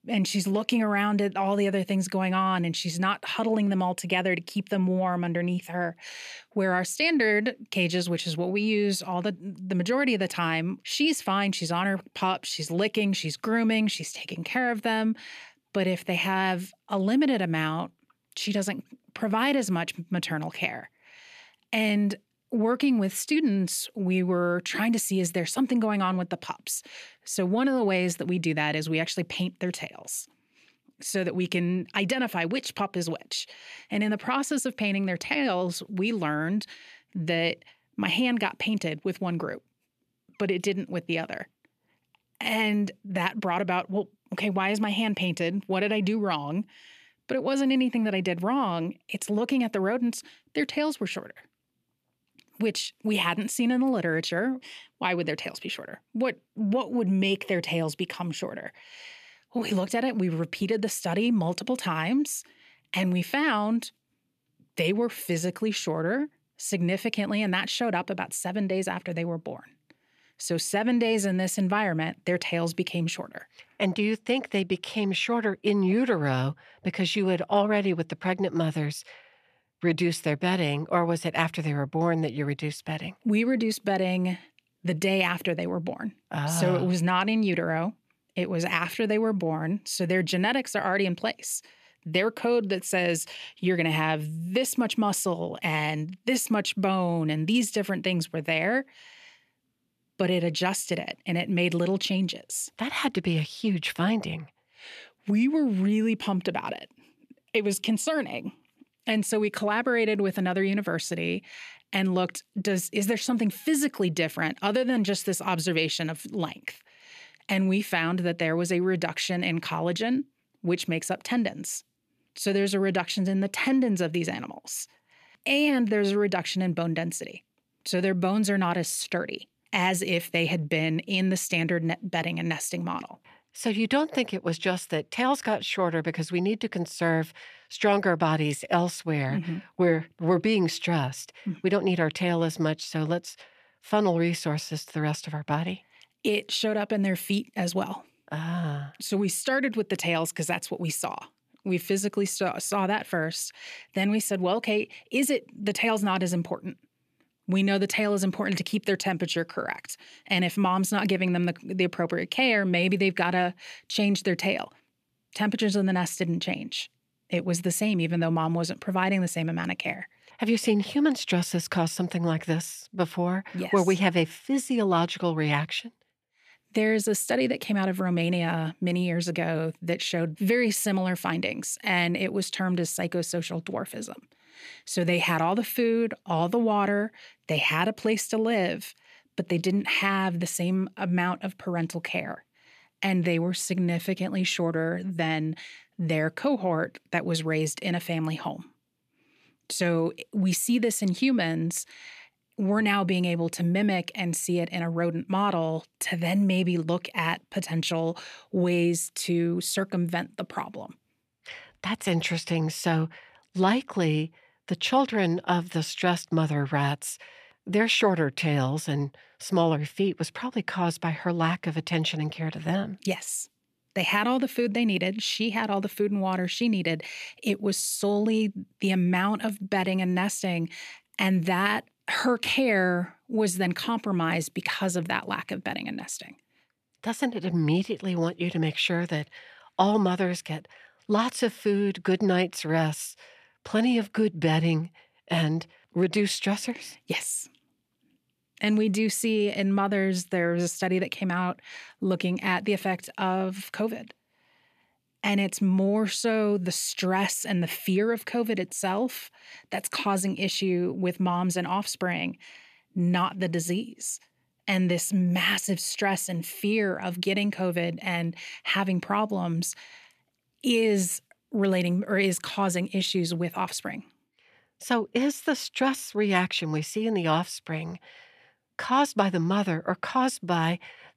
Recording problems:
none

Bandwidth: 14.5 kHz